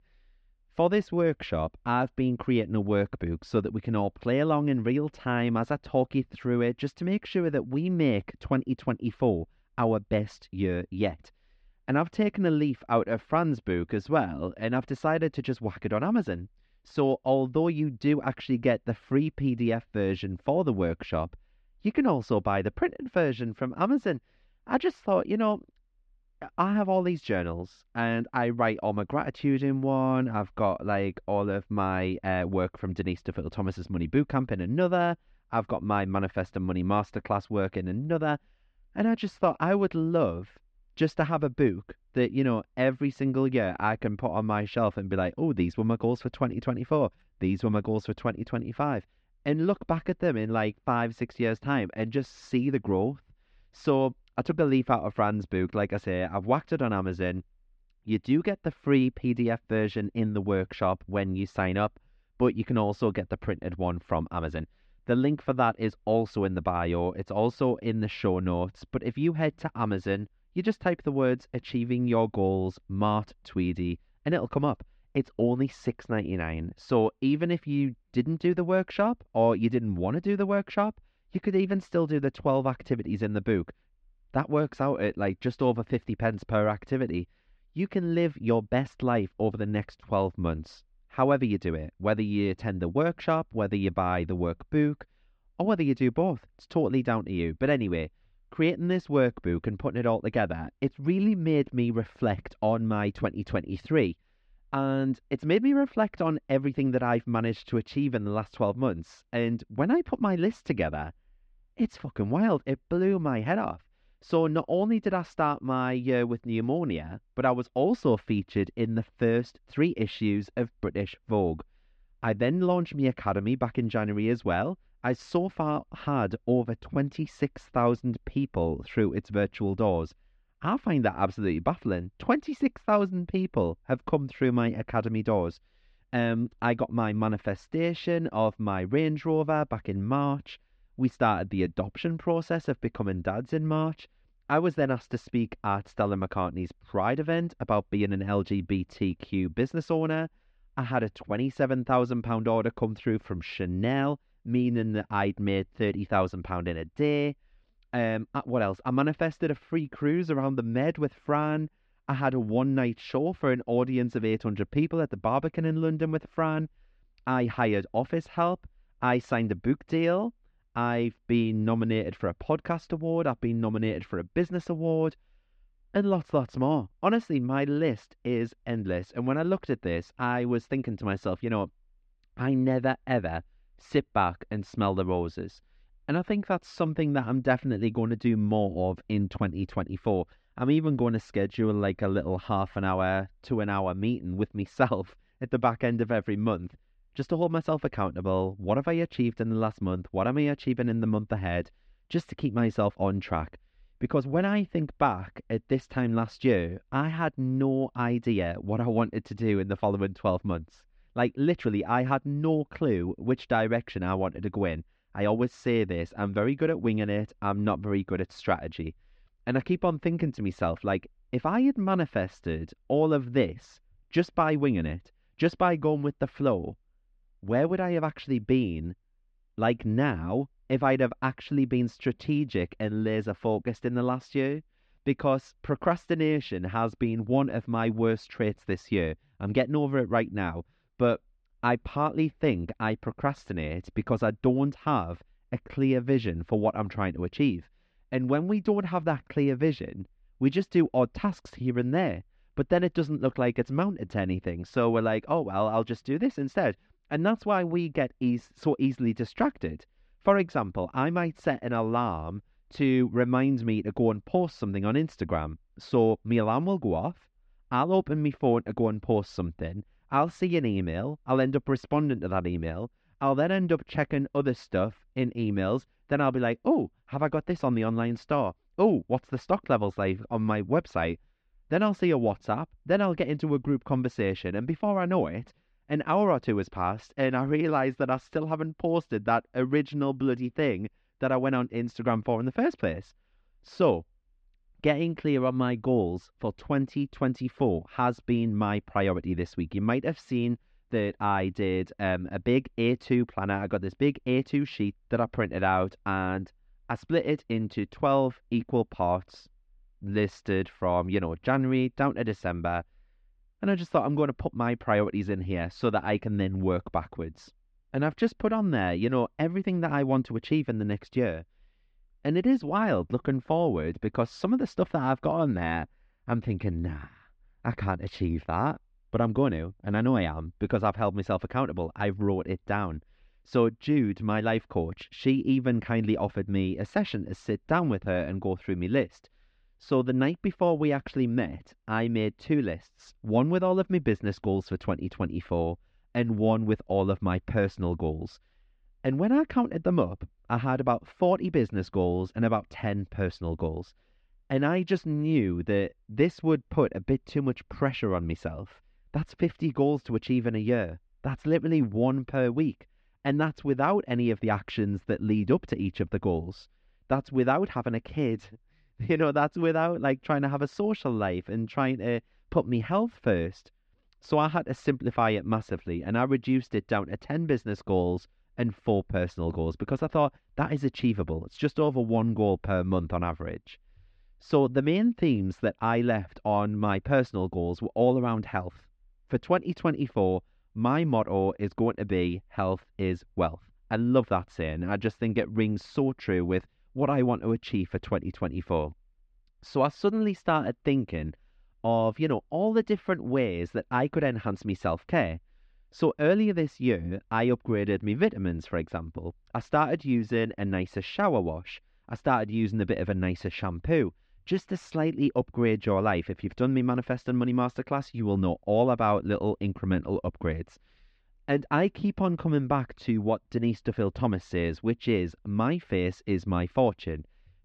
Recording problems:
muffled; slightly; fading above 3.5 kHz

